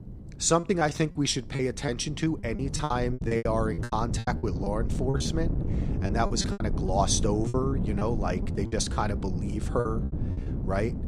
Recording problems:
wind noise on the microphone; occasional gusts; 10 dB below the speech
choppy; very; 14% of the speech affected

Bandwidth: 15 kHz